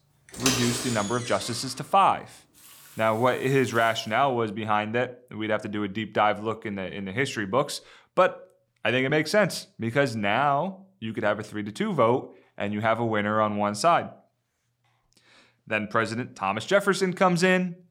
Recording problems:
household noises; loud; until 4 s; 6 dB below the speech

